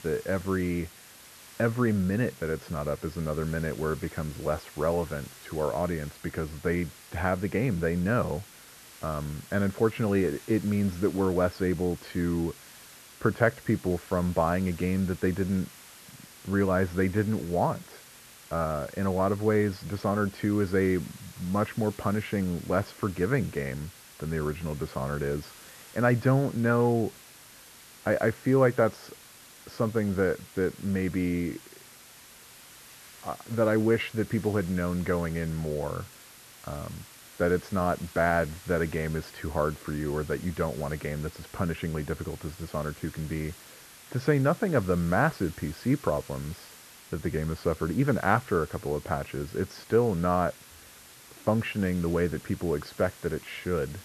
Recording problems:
muffled; very; fading above 1.5 kHz
hiss; noticeable; throughout; 20 dB below the speech

